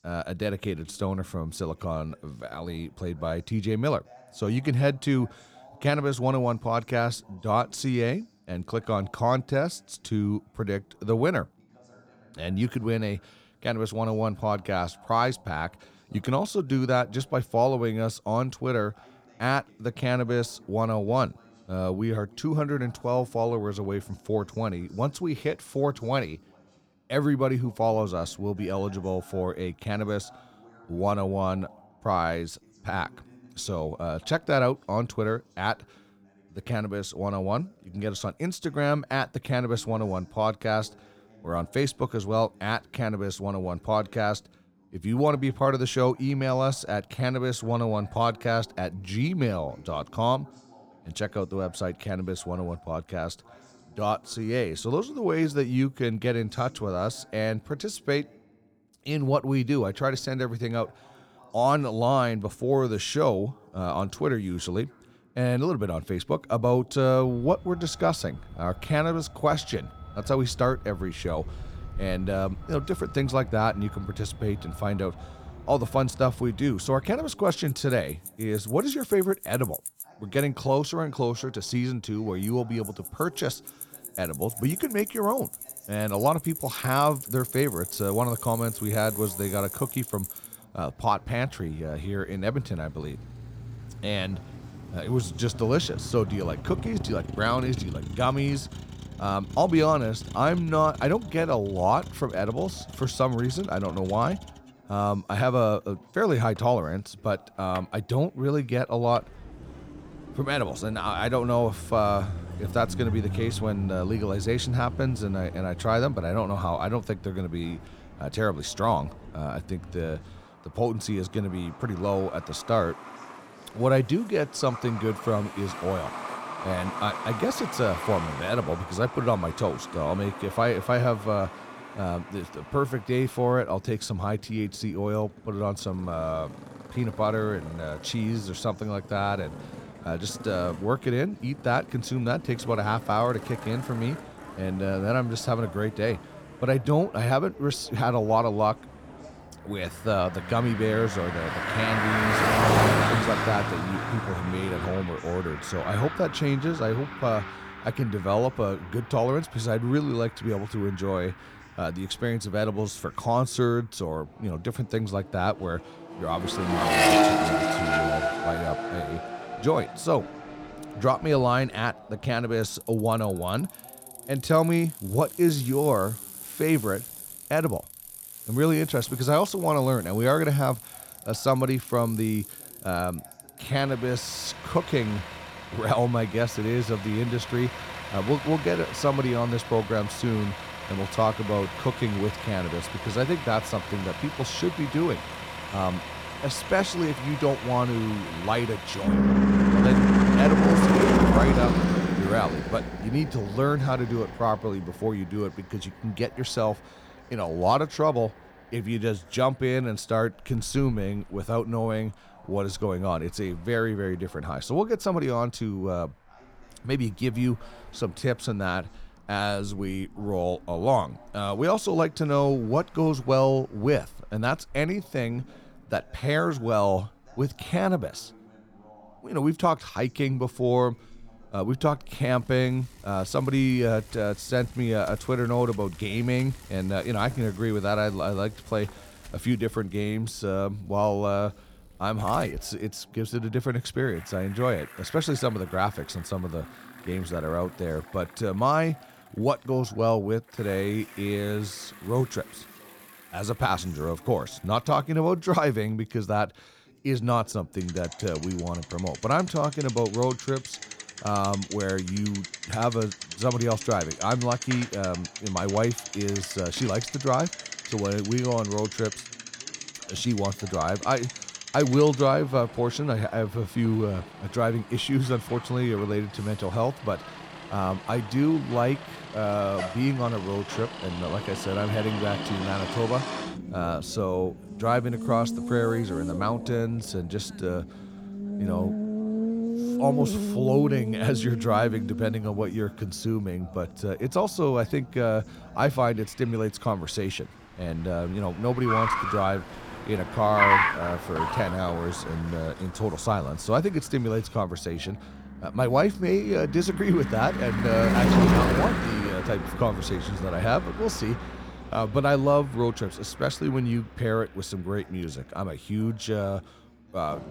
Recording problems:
traffic noise; loud; from 1:07 on; 4 dB below the speech
voice in the background; faint; throughout; 25 dB below the speech

